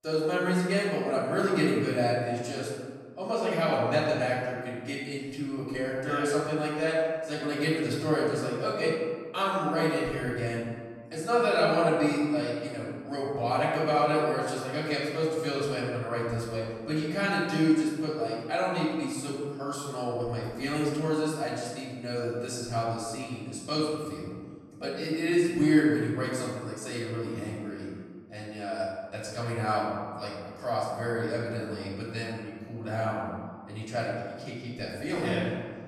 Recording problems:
off-mic speech; far
room echo; noticeable; dies away in 1.5 s

